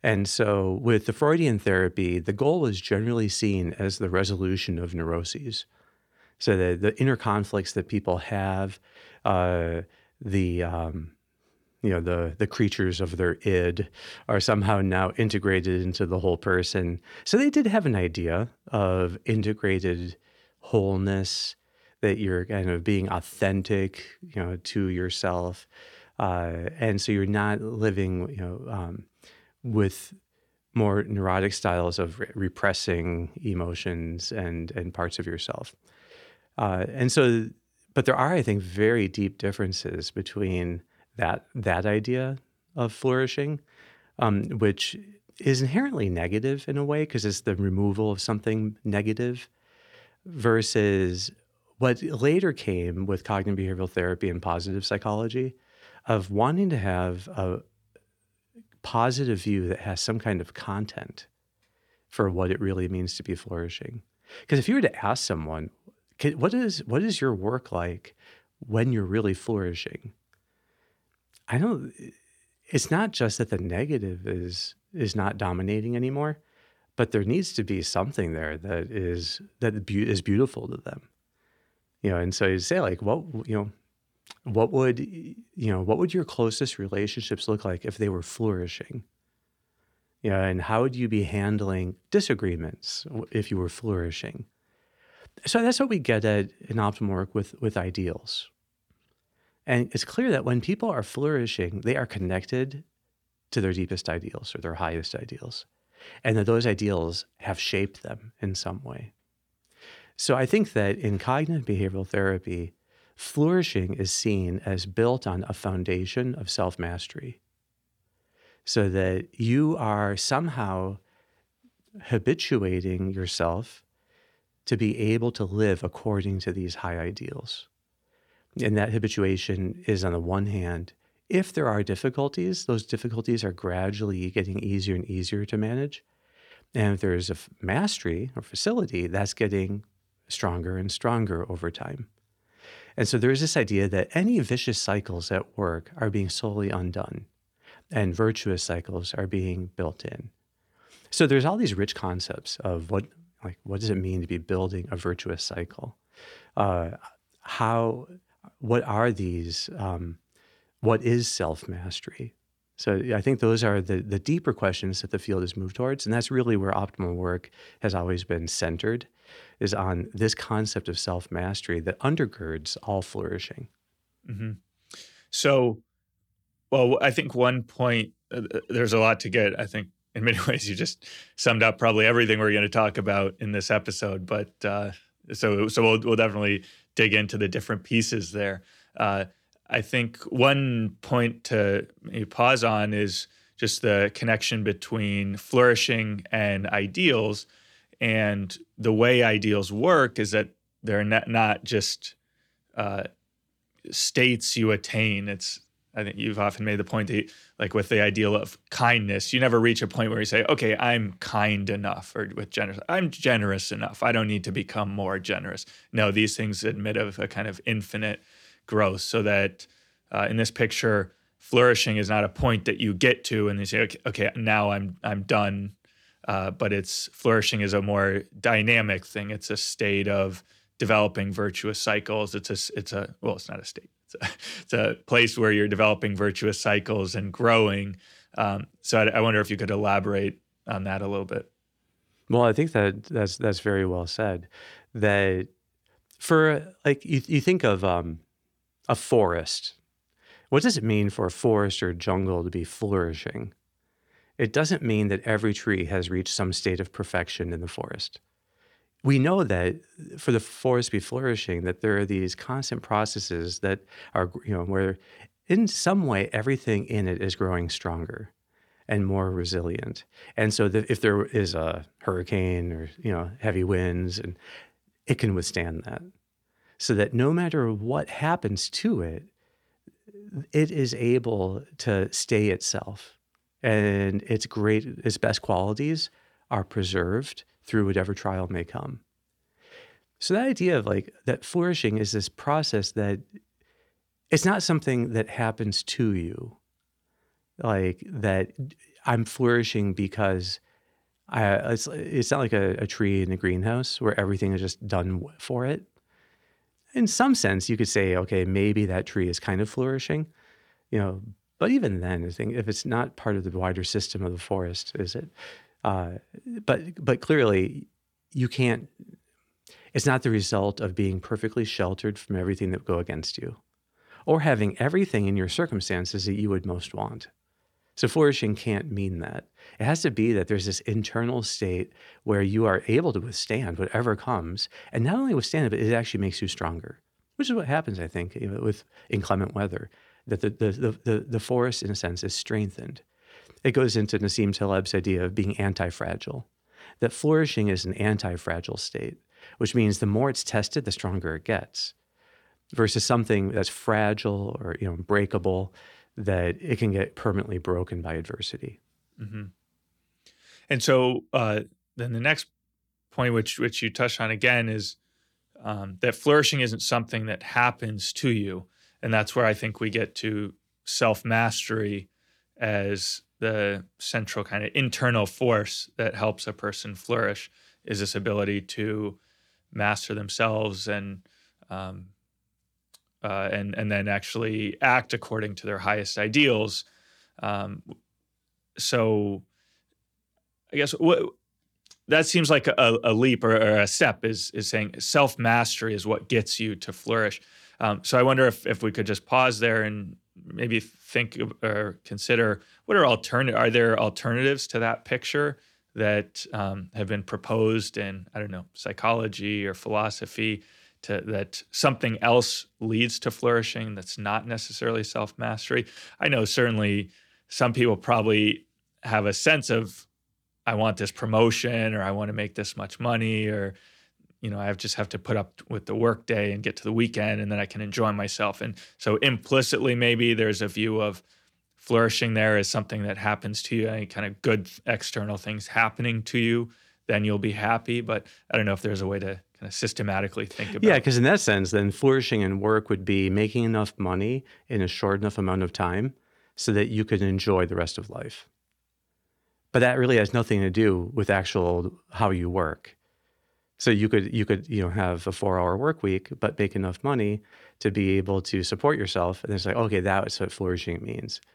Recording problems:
none

